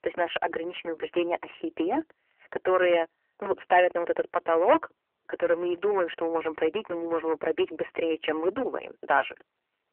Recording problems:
phone-call audio; nothing above 3 kHz
distortion; slight; 4% of the sound clipped

